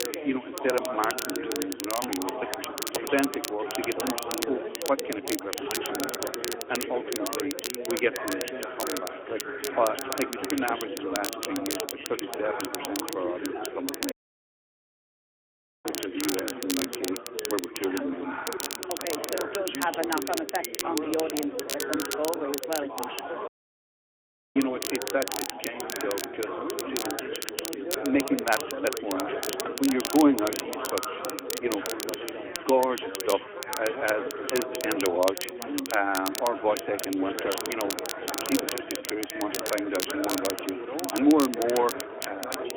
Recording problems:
phone-call audio; nothing above 3.5 kHz
chatter from many people; loud; throughout; 5 dB below the speech
crackle, like an old record; loud; 5 dB below the speech
audio cutting out; at 14 s for 1.5 s and at 23 s for 1 s

